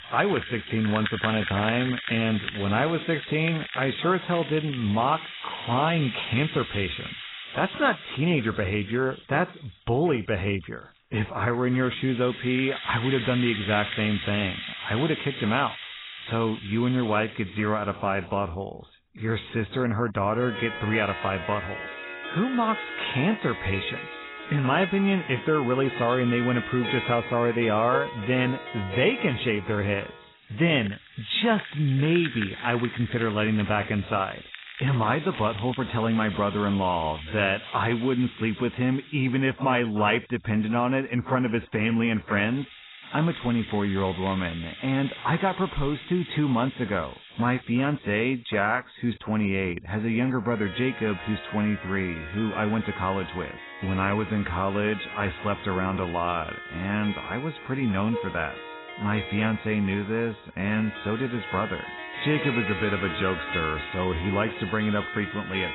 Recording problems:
garbled, watery; badly; nothing above 4 kHz
background music; loud; throughout; 10 dB below the speech

